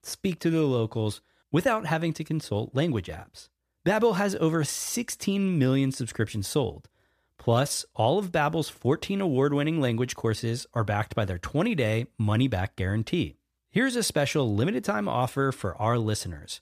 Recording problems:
none

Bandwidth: 14.5 kHz